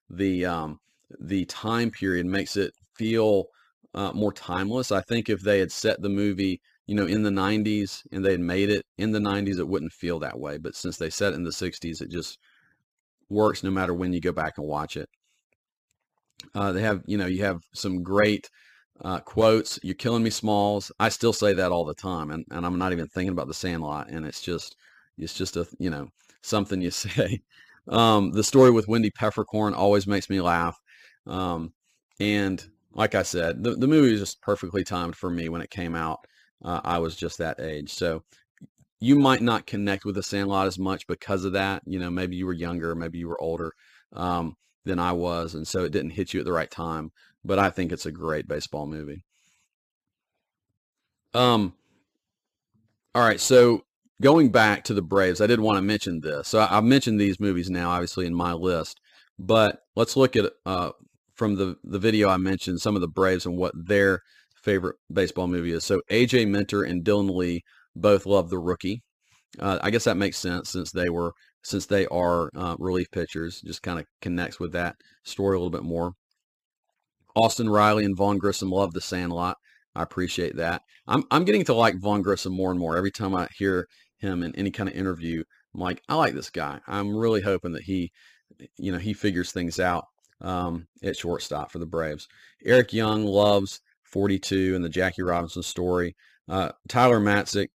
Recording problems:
none

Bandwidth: 15 kHz